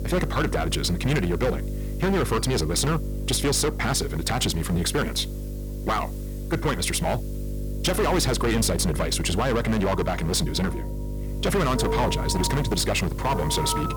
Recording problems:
distortion; heavy; 14% of the sound clipped
wrong speed, natural pitch; too fast; 1.6 times normal speed
alarms or sirens; loud; throughout; 9 dB below the speech
electrical hum; noticeable; throughout; 50 Hz, 15 dB below the speech
hiss; faint; throughout; 25 dB below the speech

